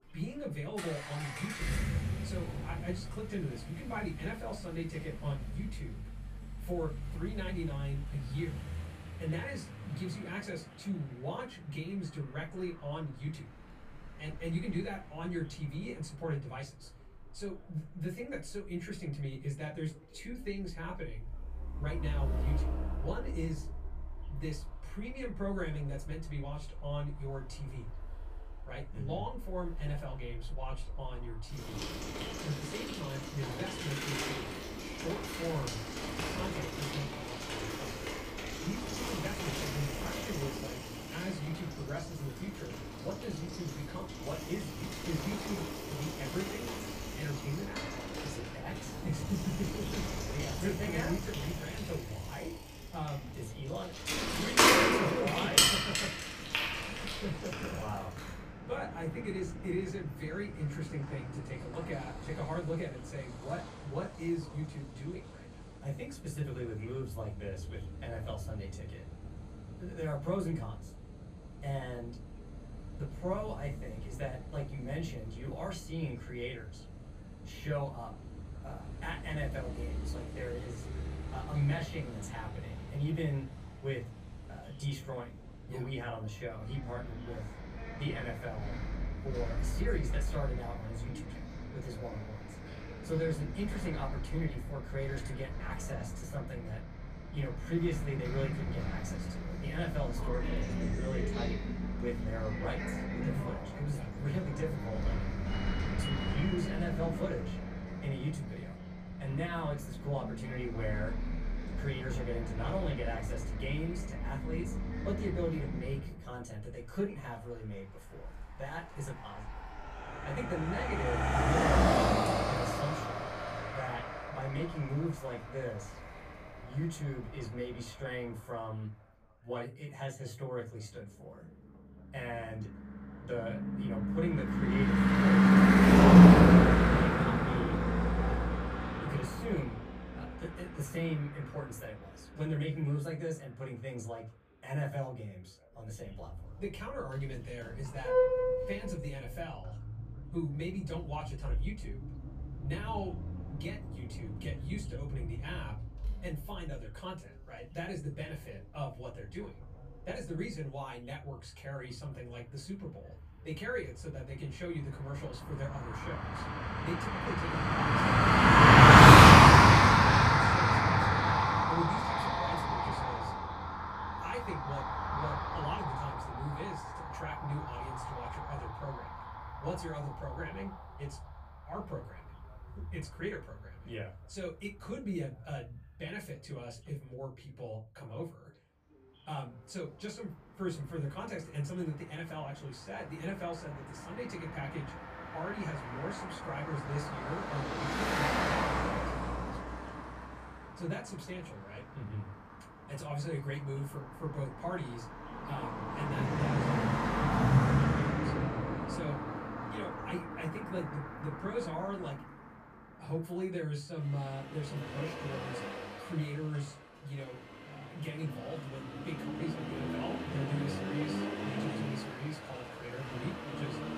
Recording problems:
off-mic speech; far
room echo; very slight; dies away in 0.2 s
traffic noise; very loud; throughout; 10 dB above the speech
voice in the background; faint; throughout; 25 dB below the speech

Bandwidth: 15 kHz